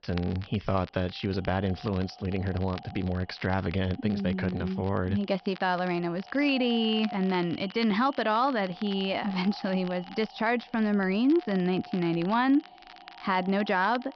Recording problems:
high frequencies cut off; noticeable; nothing above 5.5 kHz
echo of what is said; faint; throughout; 250 ms later, 20 dB below the speech
crackle, like an old record; faint; 20 dB below the speech

